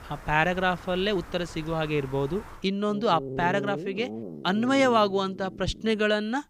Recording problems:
animal sounds; noticeable; throughout; 15 dB below the speech

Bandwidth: 15 kHz